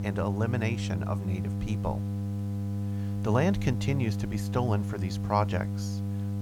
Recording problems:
electrical hum; loud; throughout; 50 Hz, 9 dB below the speech
hiss; faint; throughout; 25 dB below the speech

